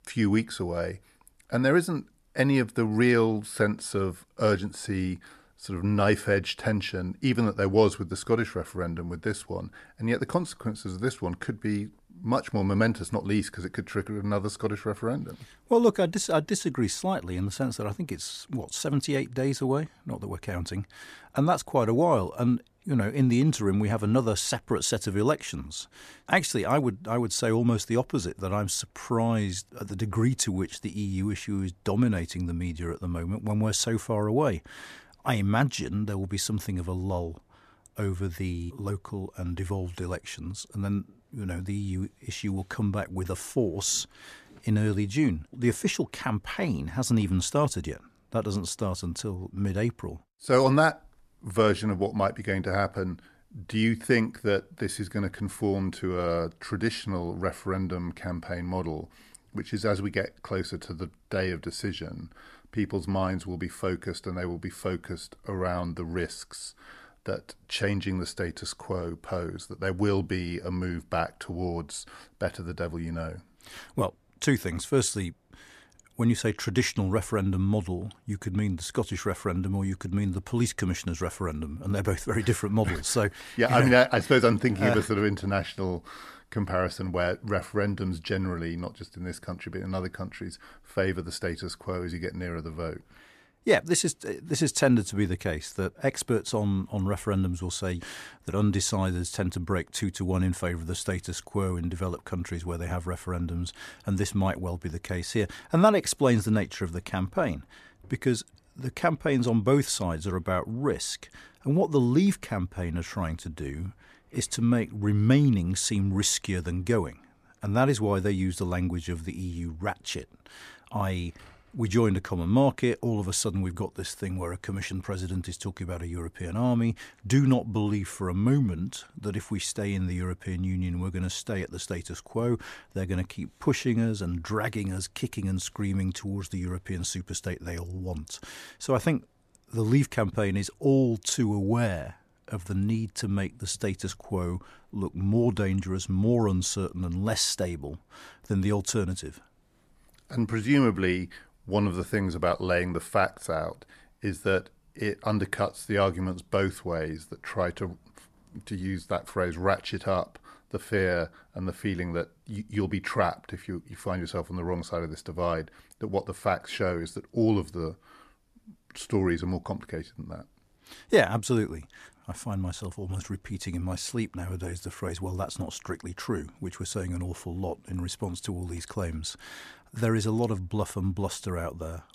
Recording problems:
none

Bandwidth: 14.5 kHz